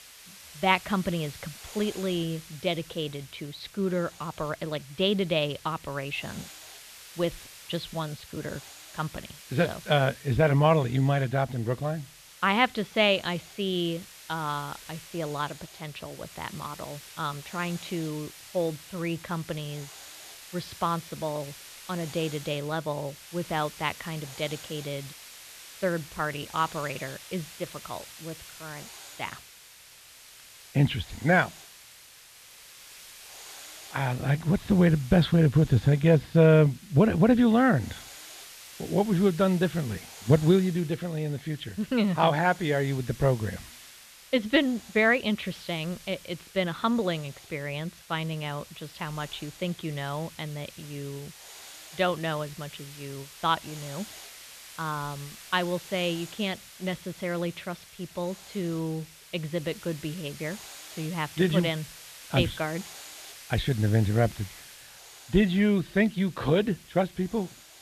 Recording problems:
muffled; slightly; fading above 3.5 kHz
hiss; noticeable; throughout; 15 dB below the speech

